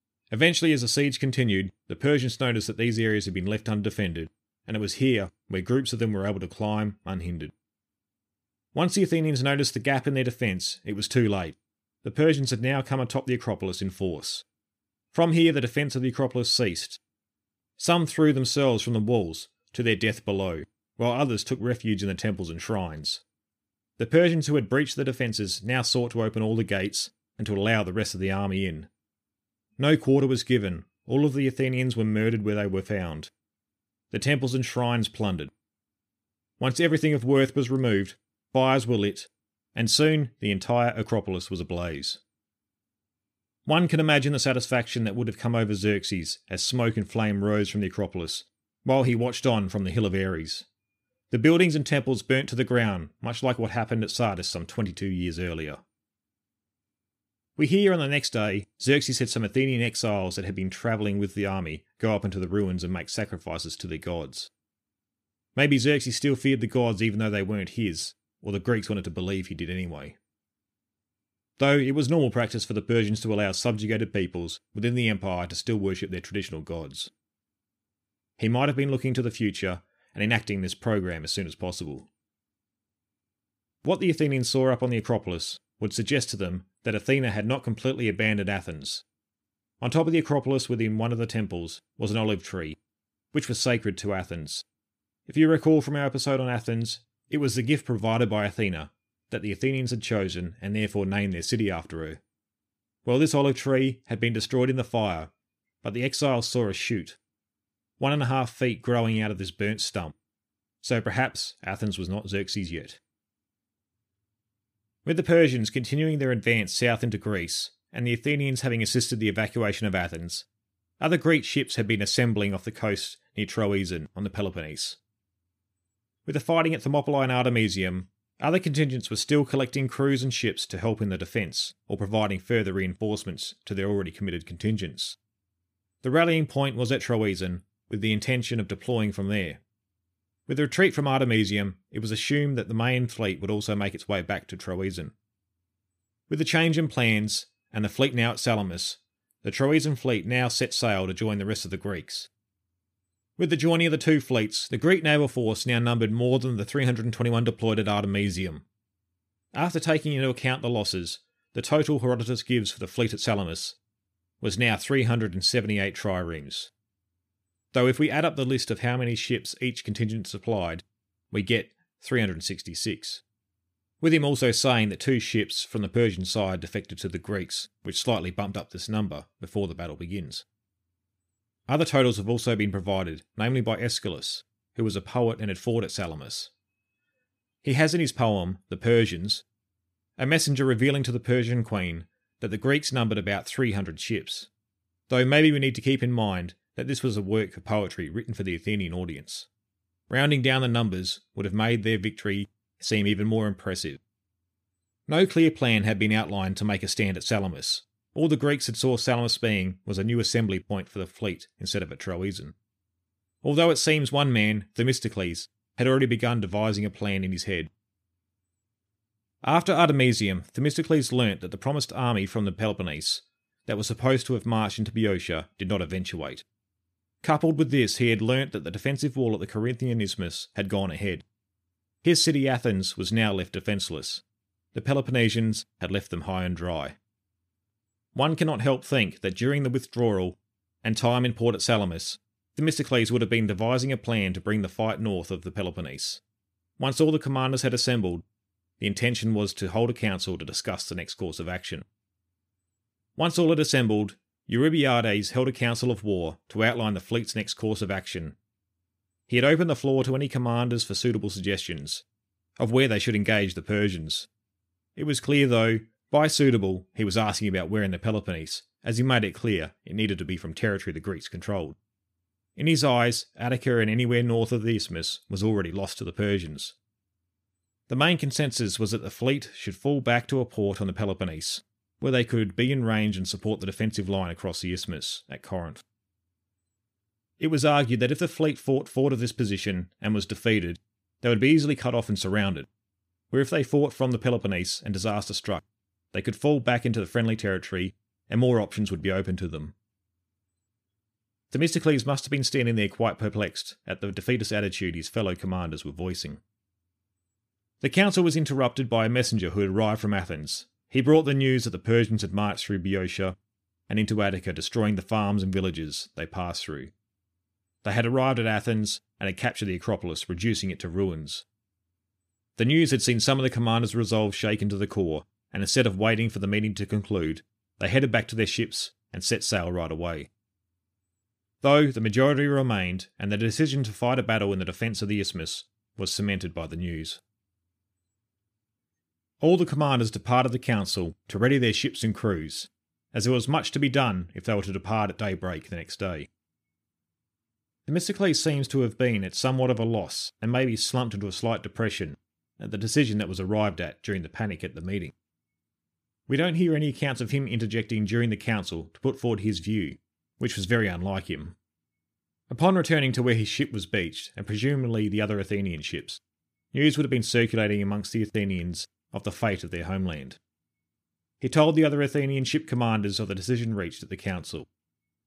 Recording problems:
none

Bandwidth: 15 kHz